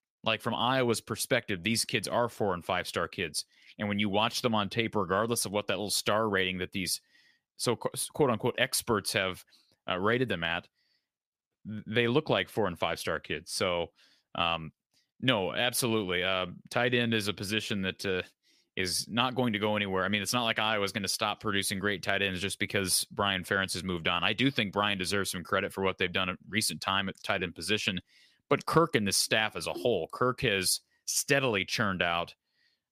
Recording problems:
none

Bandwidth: 15 kHz